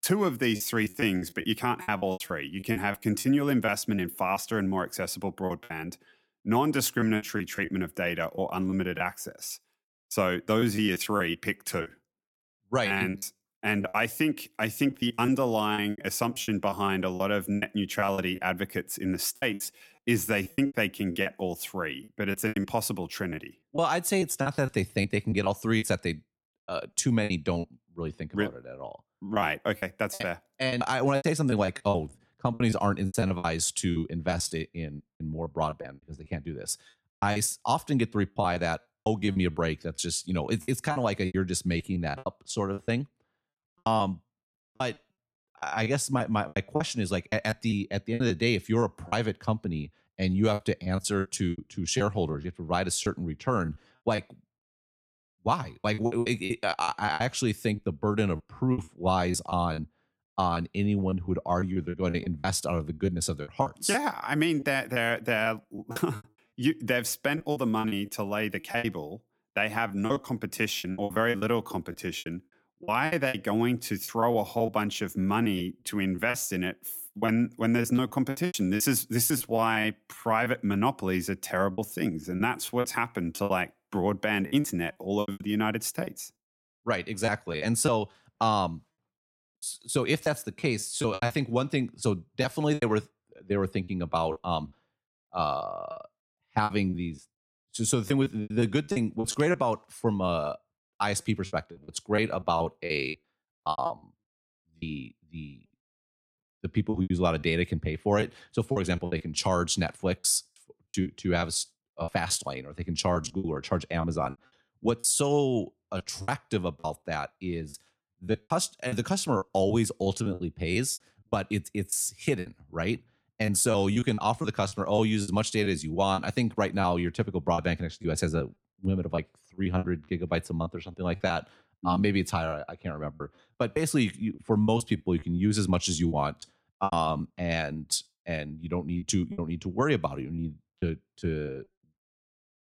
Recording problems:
choppy; very; 12% of the speech affected

